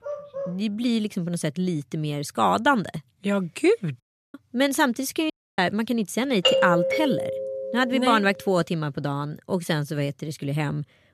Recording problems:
dog barking; noticeable; at the start; peak 8 dB below the speech
audio cutting out; at 4 s and at 5.5 s
doorbell; loud; from 6.5 to 8 s; peak 5 dB above the speech

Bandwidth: 14 kHz